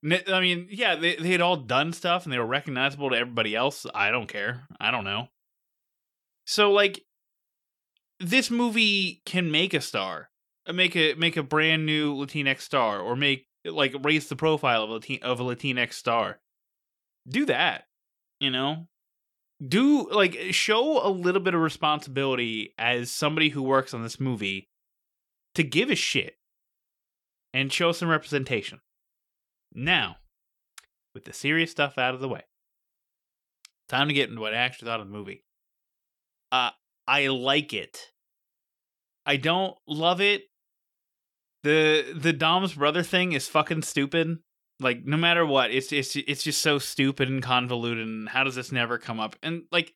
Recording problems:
none

